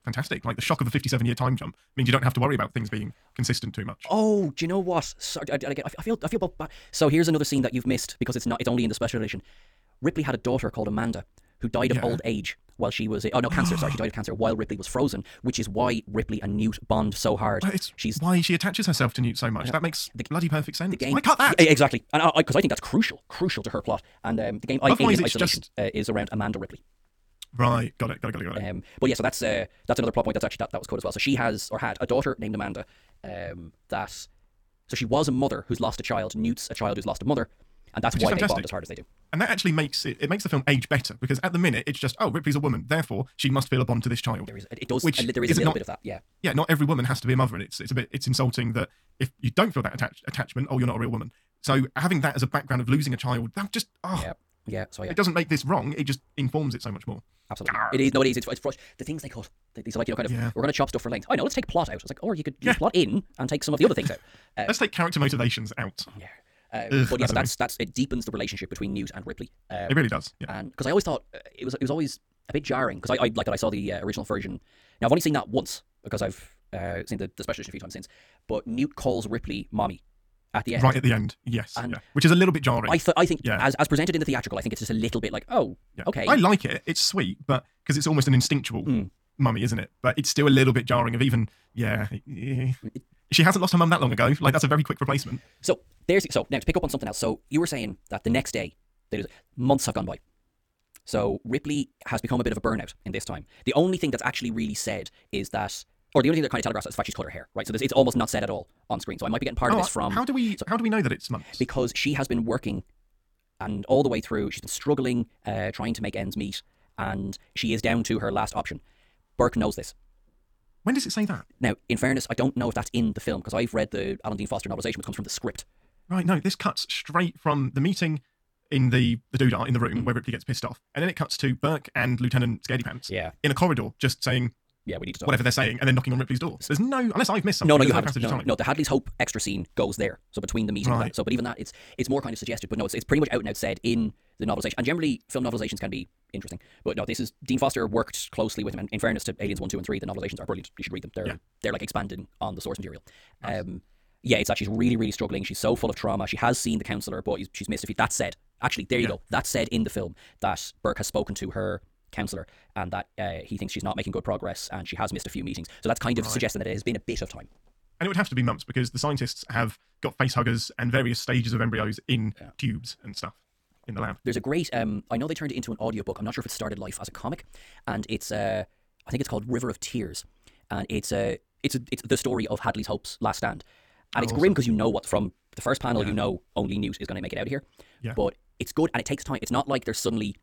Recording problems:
wrong speed, natural pitch; too fast; 1.6 times normal speed

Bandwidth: 18.5 kHz